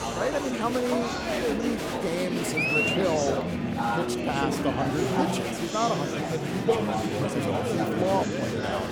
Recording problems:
murmuring crowd; very loud; throughout; 3 dB above the speech

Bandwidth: 18.5 kHz